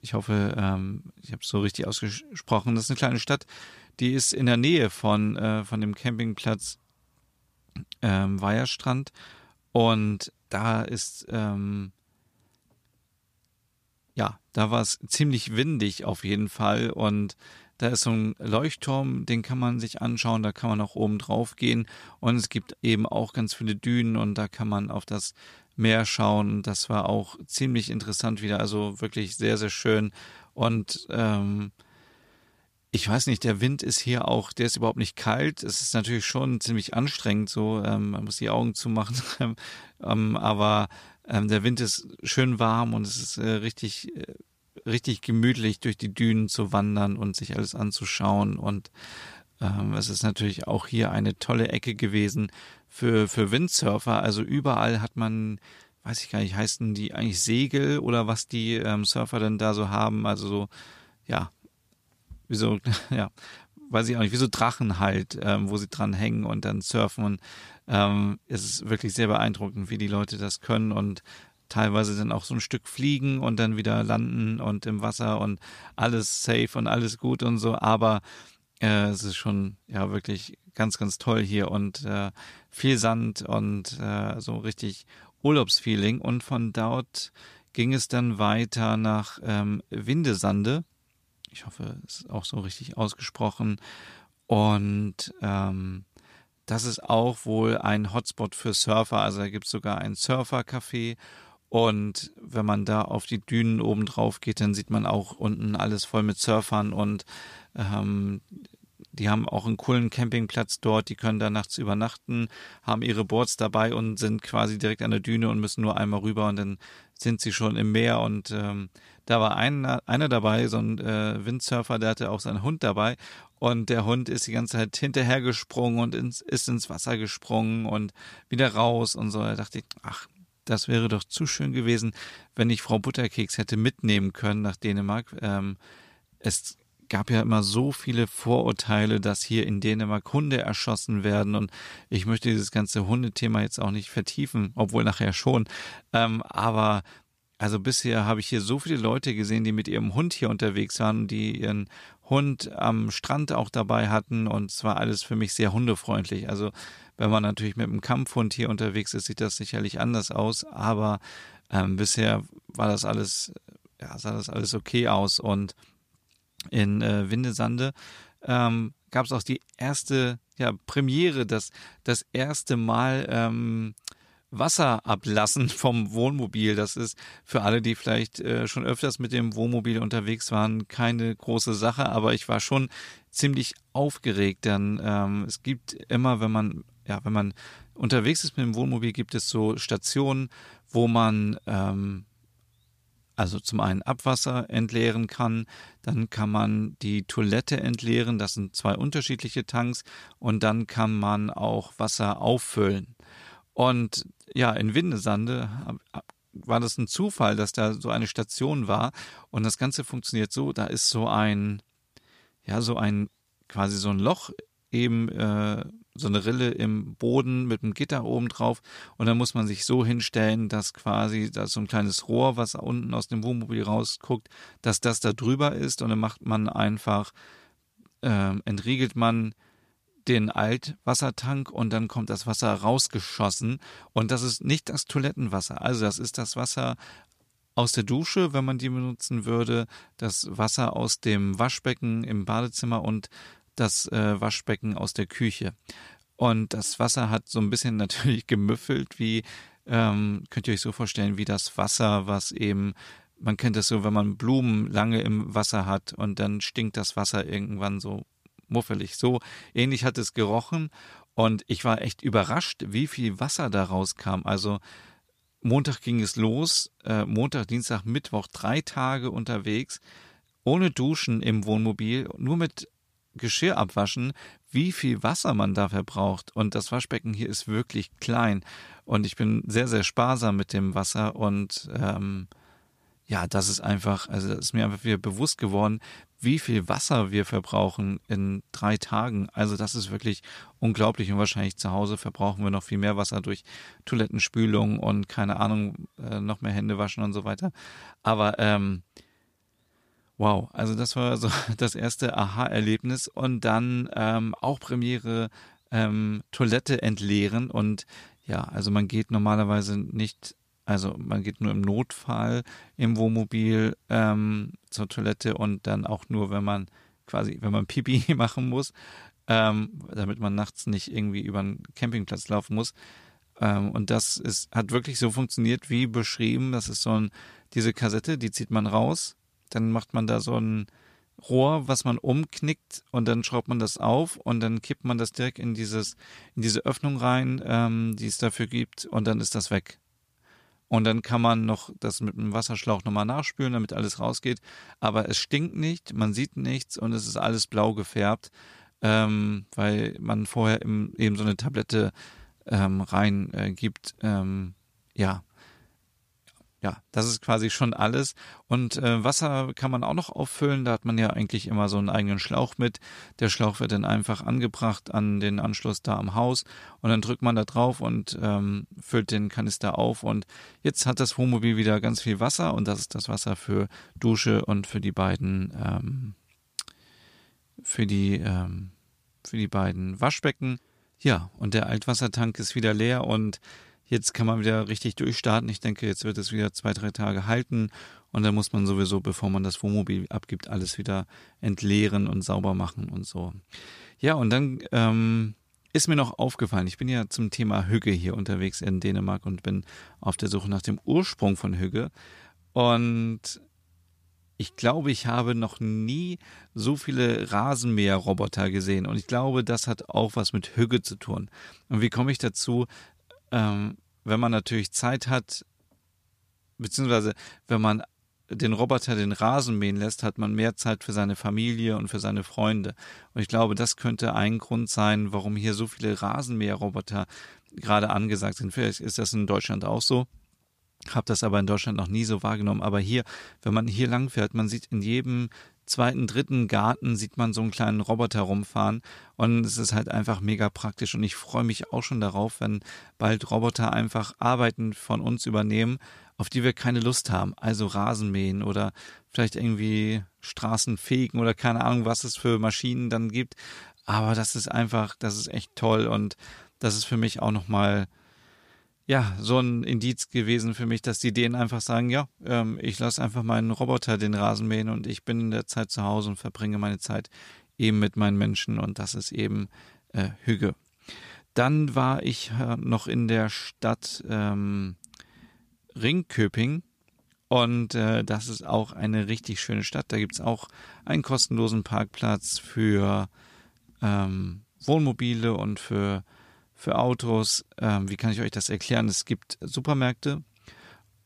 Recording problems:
none

